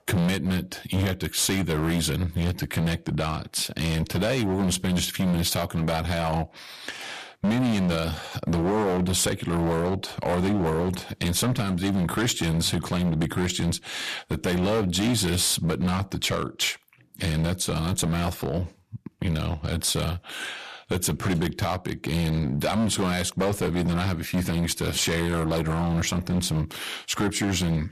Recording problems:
distortion; heavy; 14% of the sound clipped

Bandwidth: 14.5 kHz